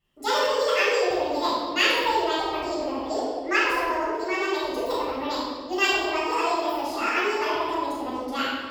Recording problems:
room echo; strong; dies away in 1.6 s
off-mic speech; far
wrong speed and pitch; too fast and too high; 1.5 times normal speed

